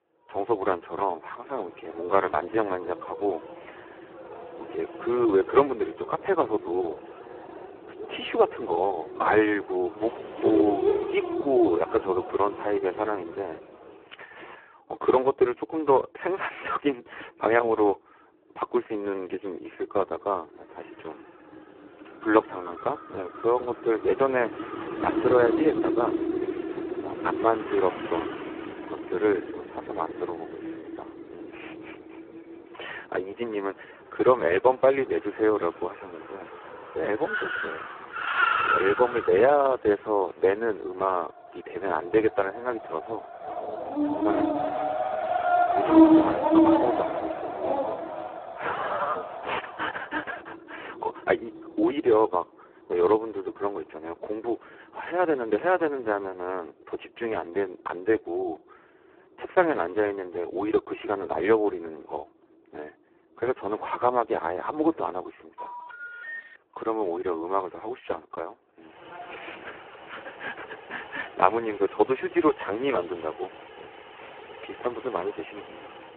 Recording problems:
phone-call audio; poor line
traffic noise; loud; throughout; 7 dB below the speech
dog barking; loud; from 44 to 48 s; peak 10 dB above the speech
phone ringing; faint; at 1:06; peak 10 dB below the speech

